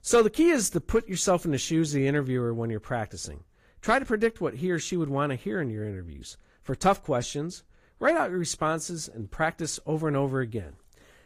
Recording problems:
garbled, watery; slightly; nothing above 15.5 kHz

